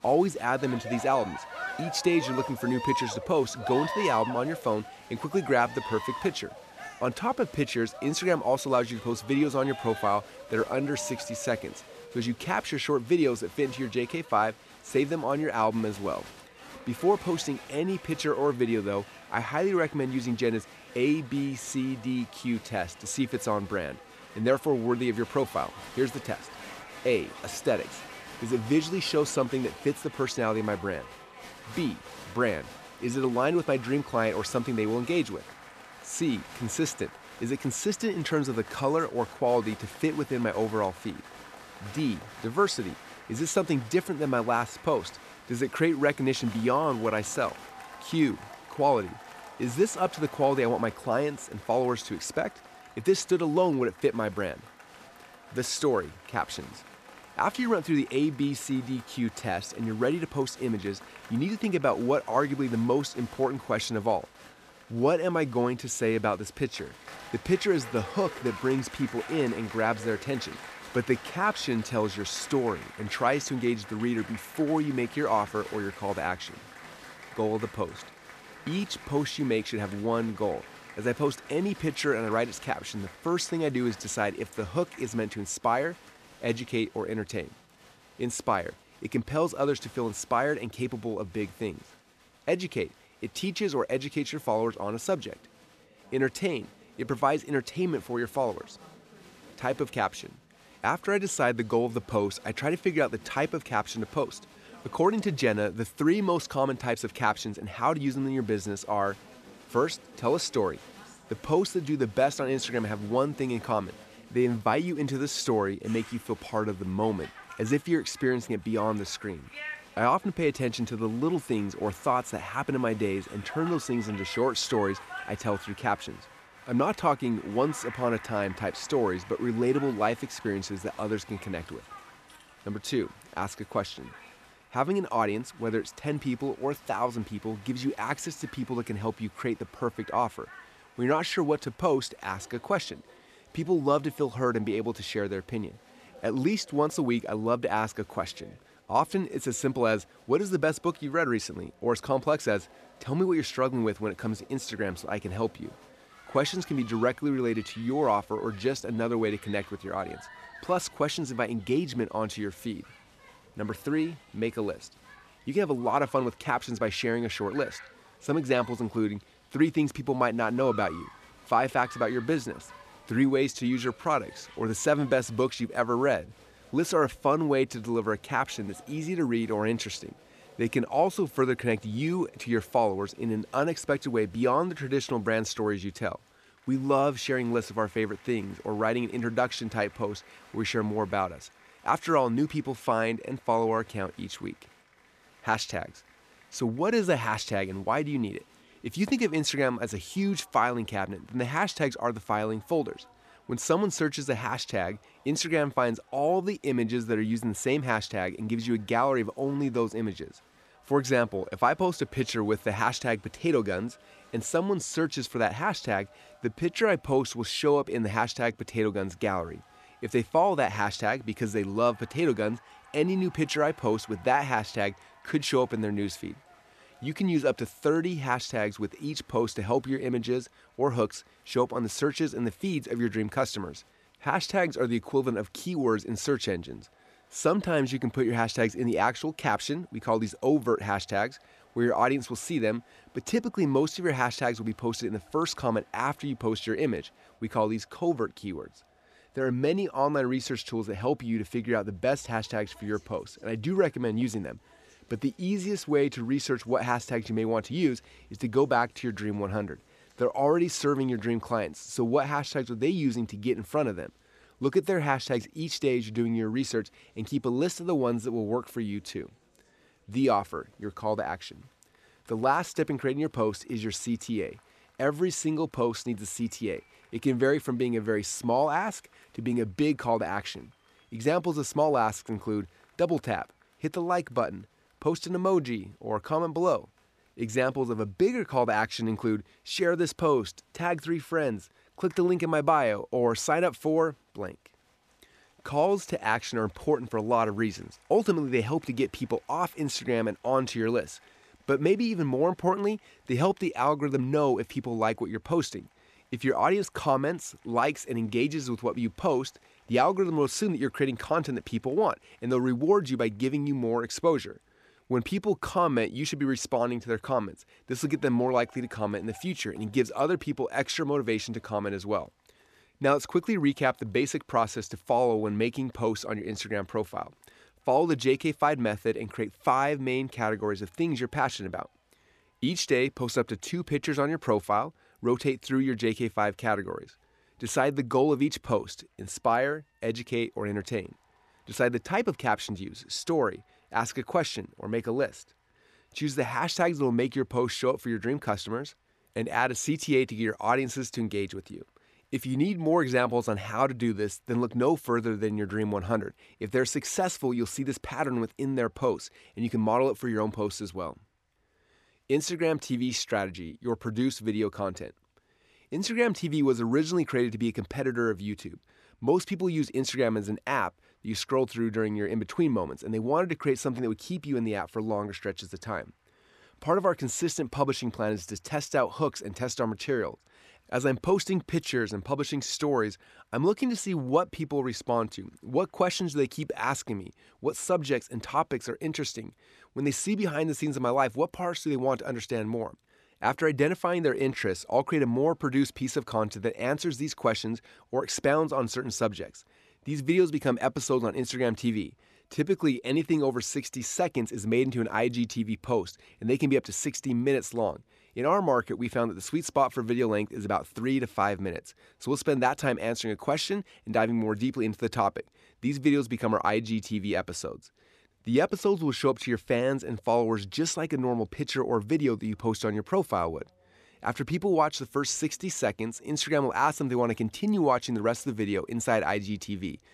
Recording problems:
crowd noise; noticeable; throughout; 20 dB below the speech

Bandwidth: 14.5 kHz